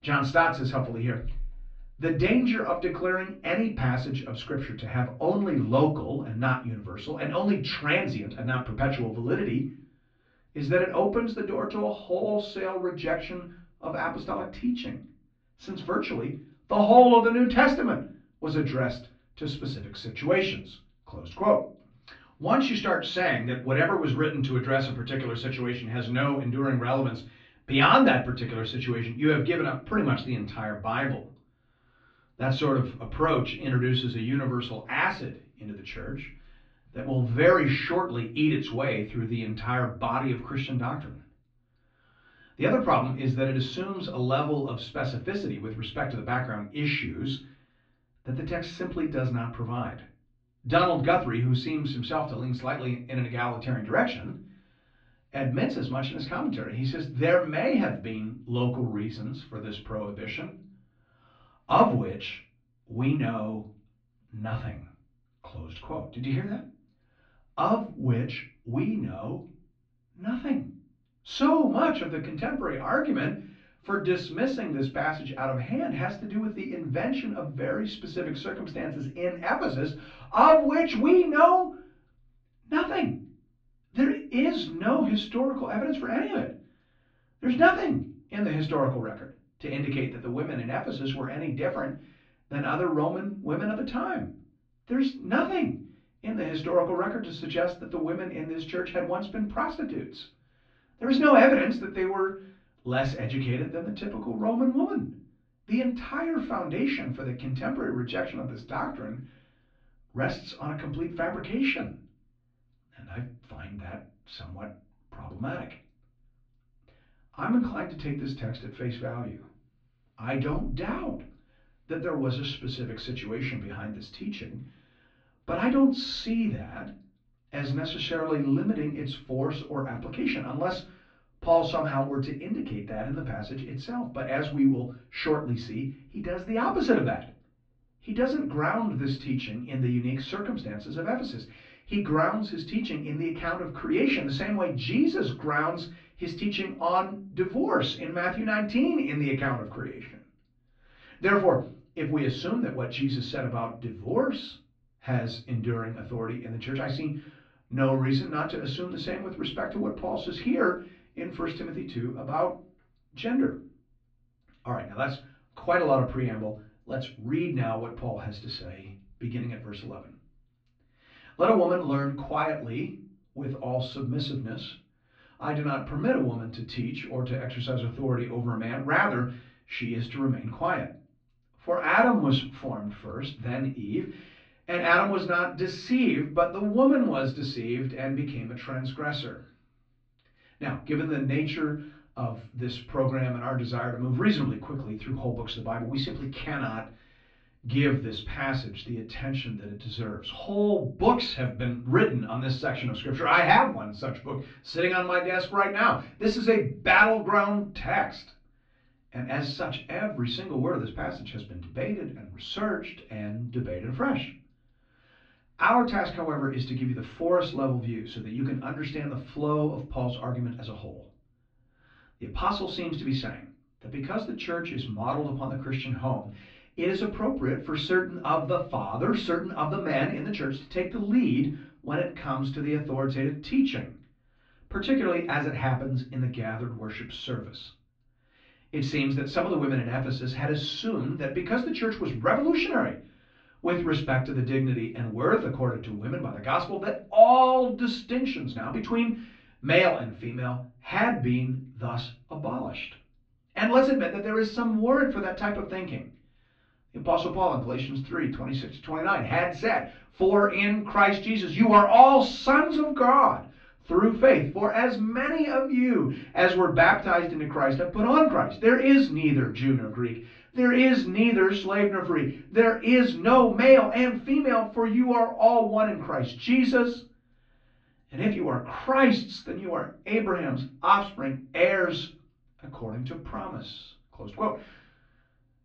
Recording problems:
off-mic speech; far
muffled; slightly; fading above 4 kHz
room echo; slight; dies away in 0.3 s

